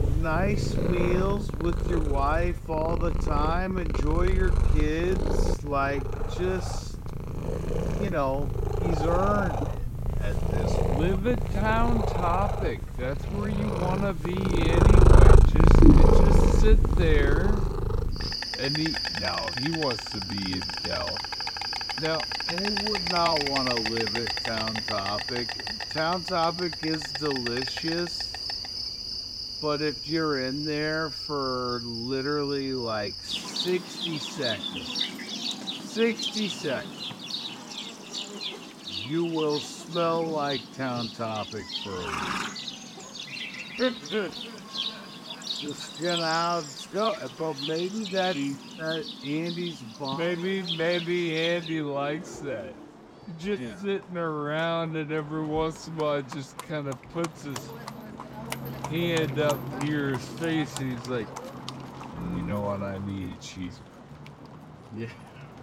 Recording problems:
wrong speed, natural pitch; too slow; 0.6 times normal speed
animal sounds; very loud; throughout; 2 dB above the speech

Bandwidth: 16 kHz